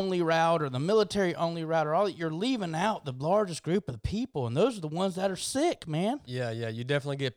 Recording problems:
abrupt cut into speech; at the start

